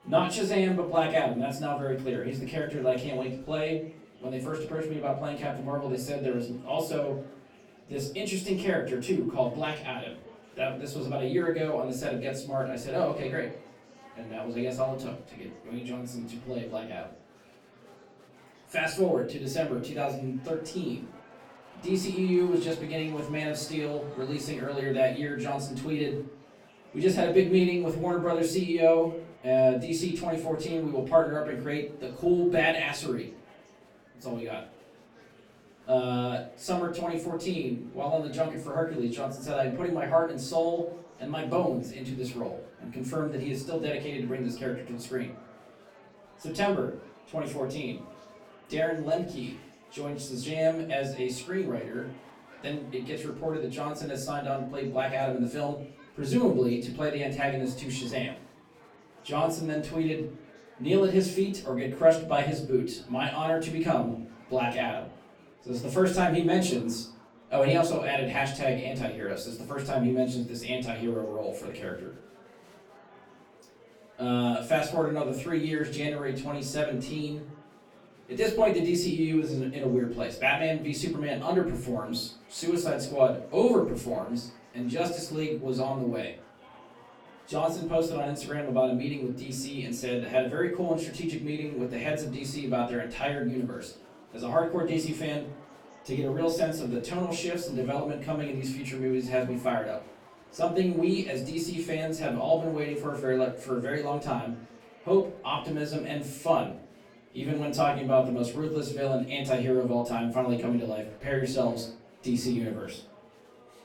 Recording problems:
off-mic speech; far
room echo; slight; dies away in 0.4 s
murmuring crowd; faint; throughout; 25 dB below the speech

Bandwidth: 18 kHz